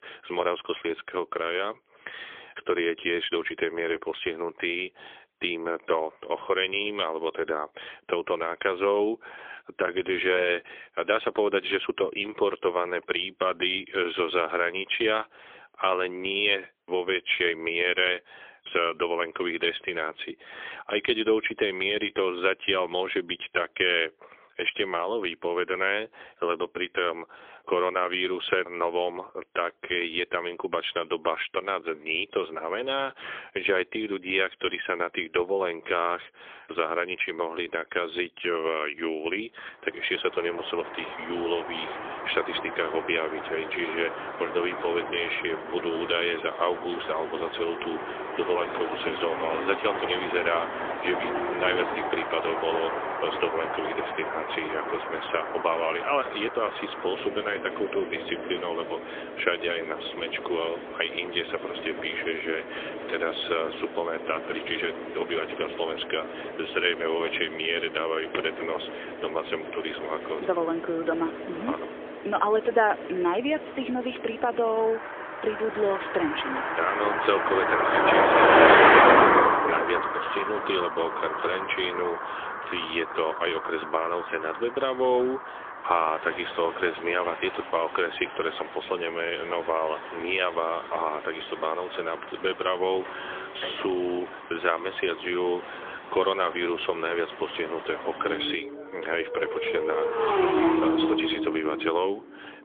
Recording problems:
phone-call audio; poor line; nothing above 3.5 kHz
traffic noise; loud; from 40 s on; 1 dB below the speech

